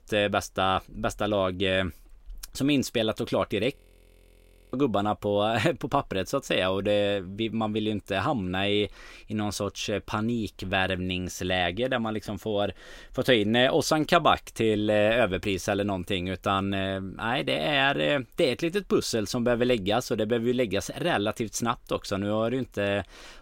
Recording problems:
audio freezing; at 4 s for 1 s

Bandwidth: 16 kHz